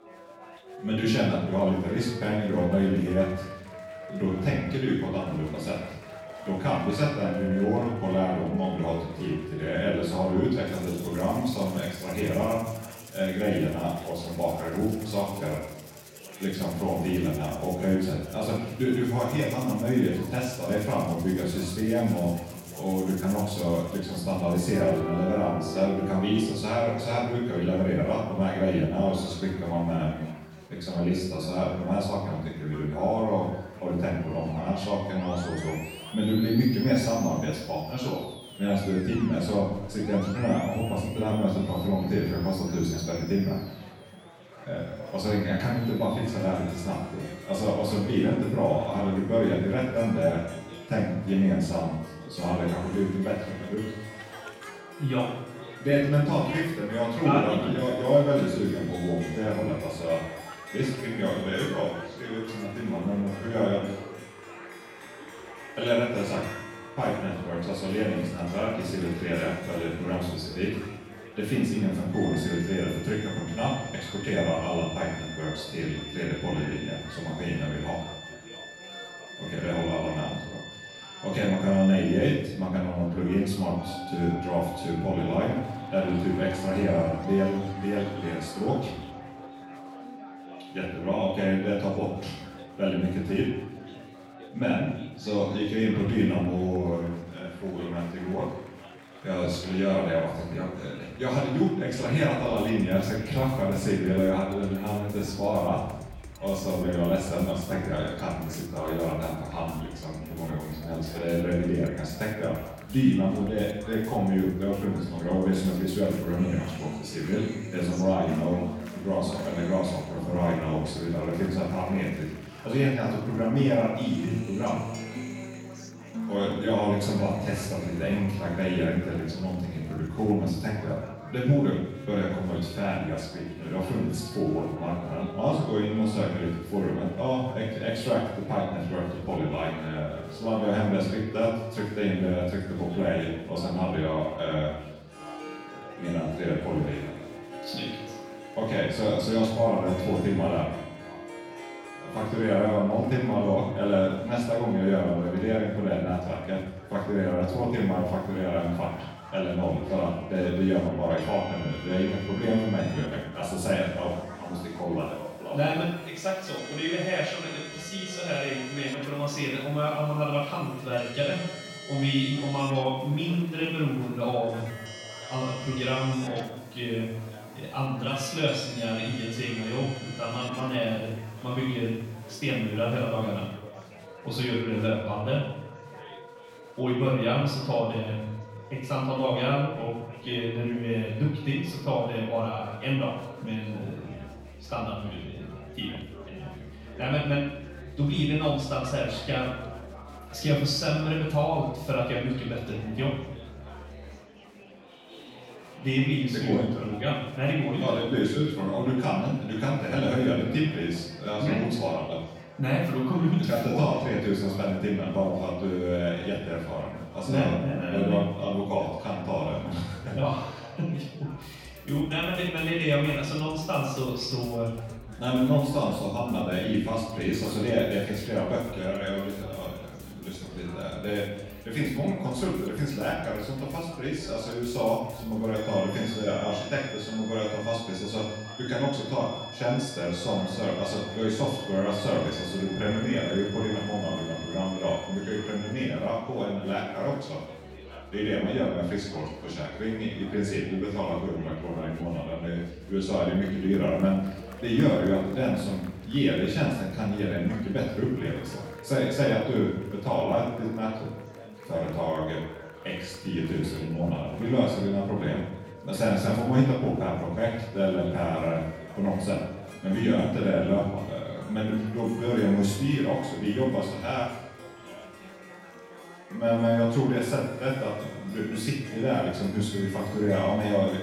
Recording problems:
off-mic speech; far
room echo; noticeable; dies away in 0.8 s
background music; noticeable; throughout; 15 dB below the speech
chatter from many people; noticeable; throughout; 20 dB below the speech

